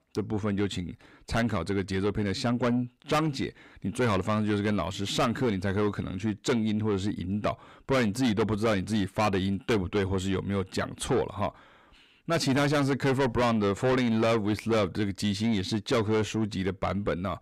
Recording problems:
distortion; heavy; 6 dB below the speech

